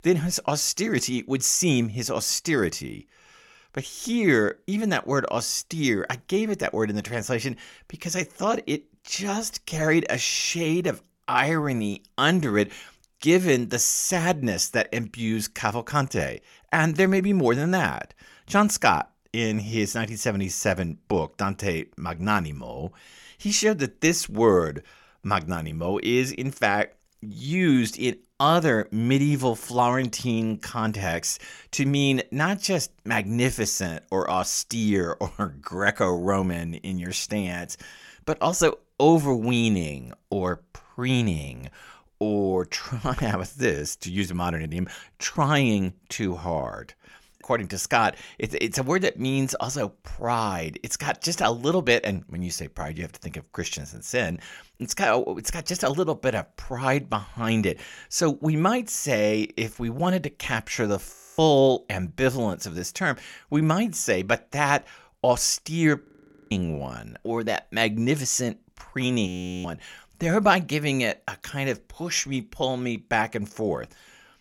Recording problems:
audio freezing; at 1:01, at 1:06 and at 1:09

